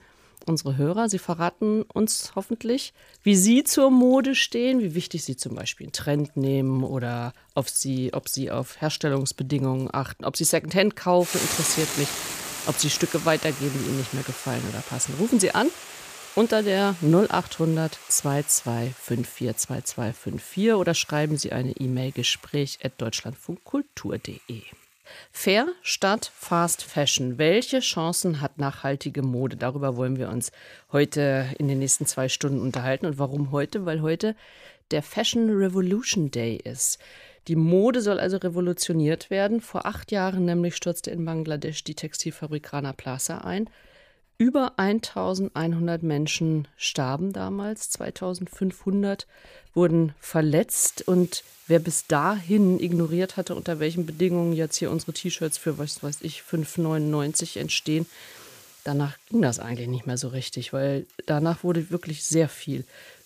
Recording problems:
household noises; noticeable; throughout; 10 dB below the speech

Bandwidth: 15 kHz